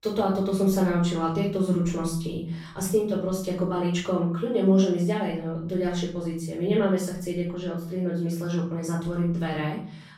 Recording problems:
off-mic speech; far
room echo; noticeable; dies away in 0.6 s

